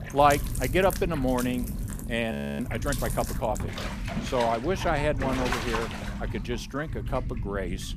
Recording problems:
household noises; loud; throughout; 7 dB below the speech
low rumble; noticeable; throughout; 20 dB below the speech
audio freezing; at 2.5 s

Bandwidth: 14.5 kHz